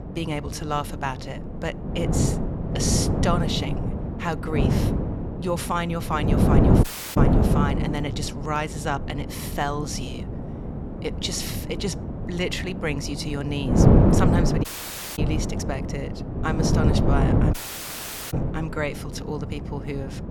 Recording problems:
wind noise on the microphone; heavy; 1 dB below the speech
audio cutting out; at 7 s, at 15 s for 0.5 s and at 18 s for 1 s

